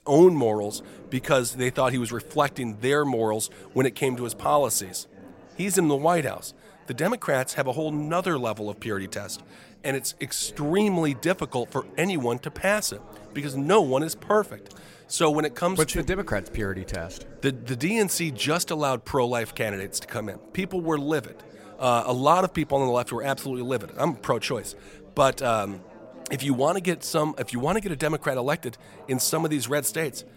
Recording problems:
background chatter; faint; throughout; 4 voices, 20 dB below the speech

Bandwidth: 16 kHz